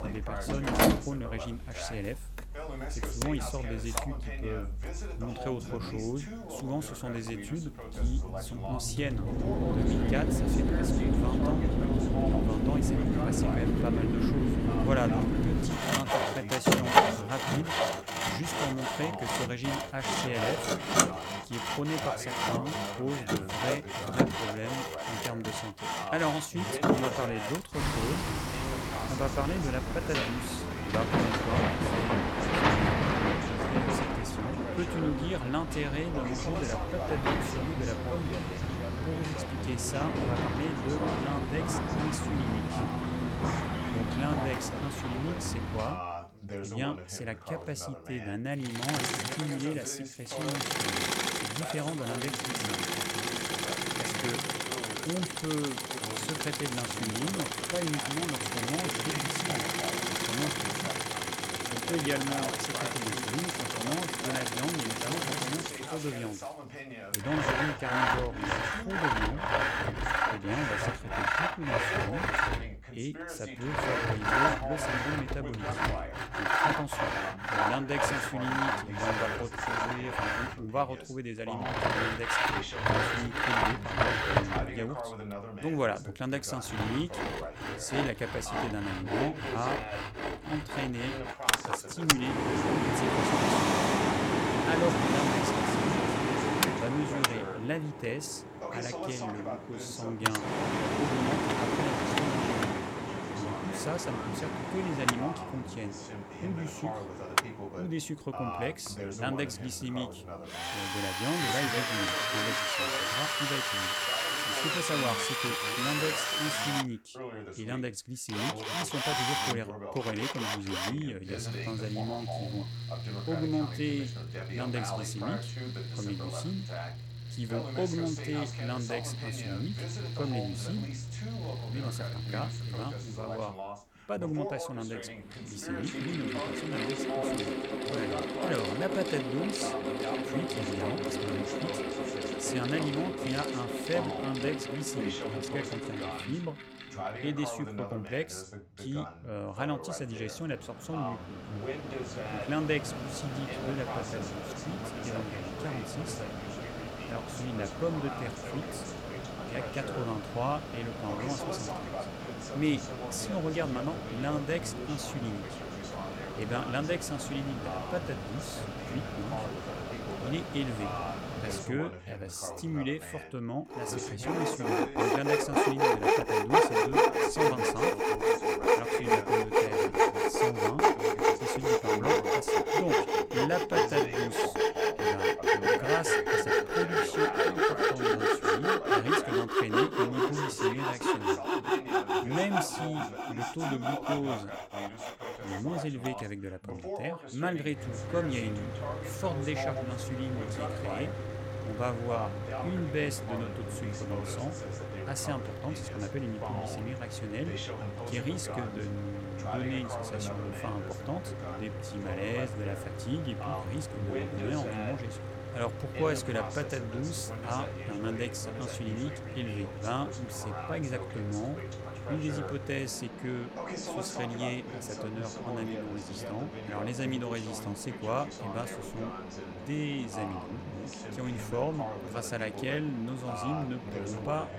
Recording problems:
machinery noise; very loud; throughout; 5 dB above the speech
voice in the background; loud; throughout; 6 dB below the speech

